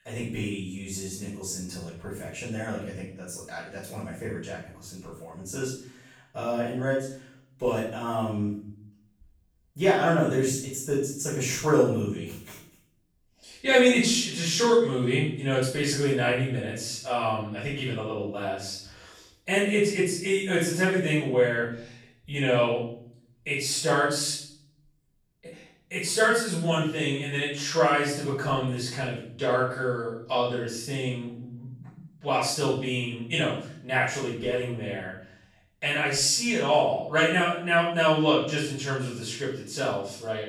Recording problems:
off-mic speech; far
room echo; noticeable; dies away in 0.6 s

